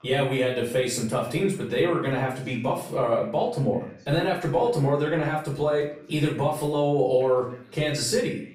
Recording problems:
off-mic speech; far
room echo; noticeable; dies away in 0.4 s
voice in the background; faint; throughout; 30 dB below the speech

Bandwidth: 15.5 kHz